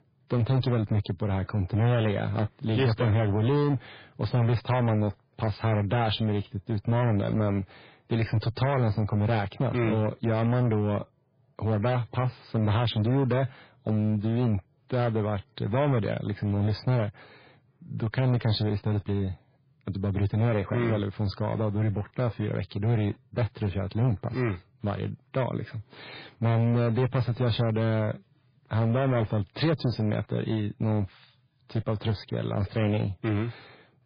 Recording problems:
garbled, watery; badly; nothing above 4 kHz
distortion; slight; 9% of the sound clipped

